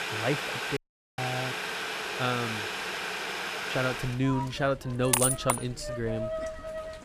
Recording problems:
household noises; loud; throughout; as loud as the speech
audio cutting out; at 1 s

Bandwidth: 15 kHz